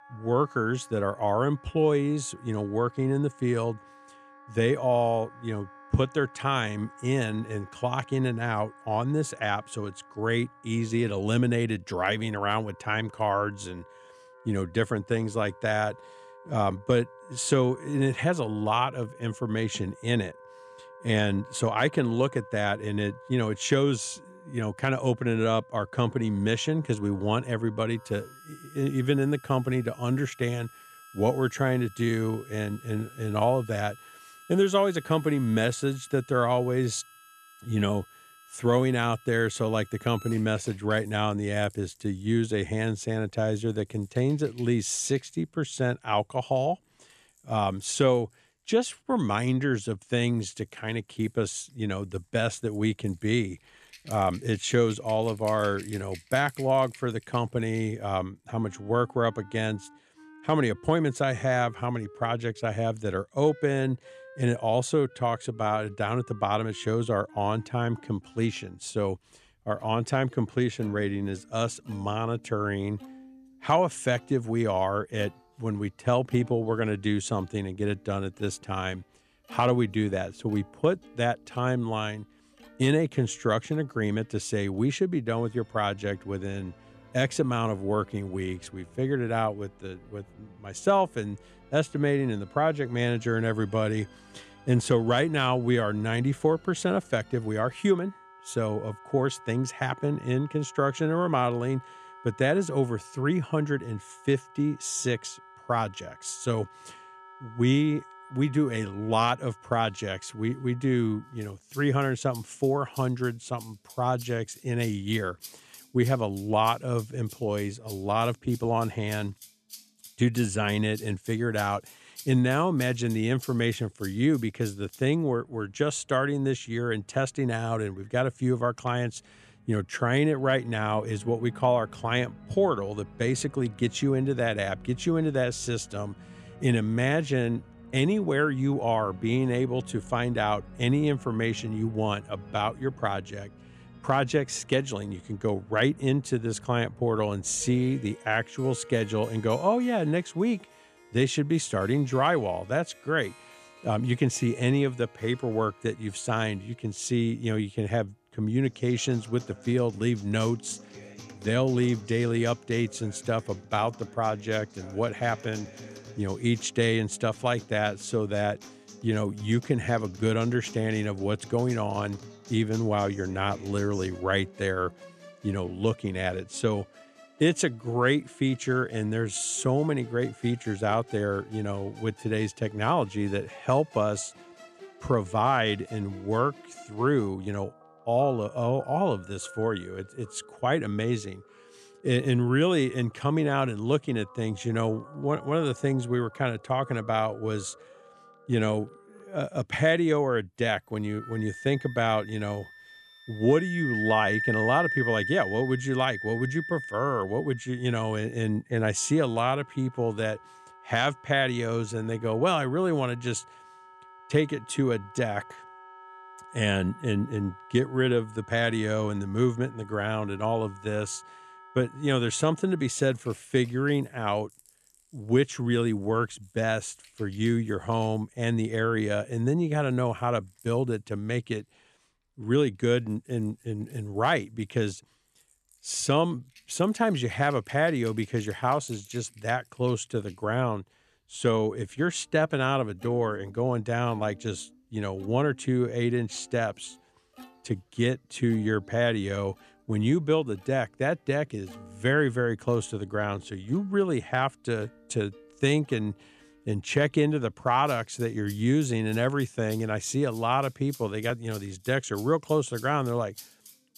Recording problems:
background music; noticeable; throughout; 20 dB below the speech

